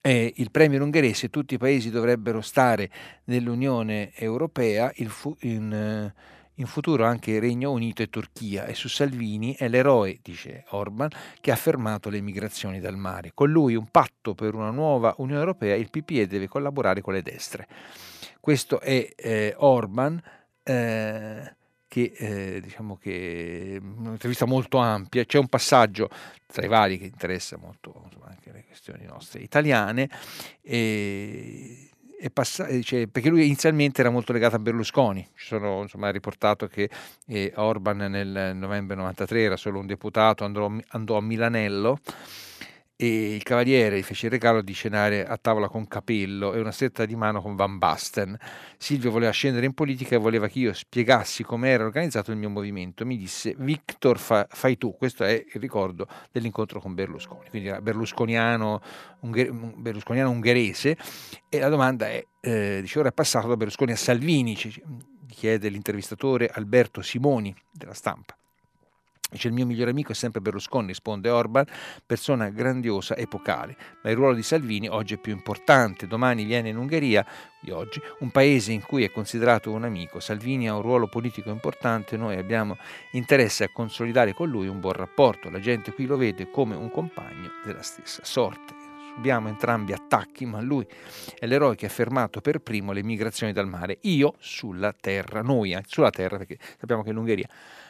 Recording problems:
background music; faint; throughout; 20 dB below the speech

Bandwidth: 14 kHz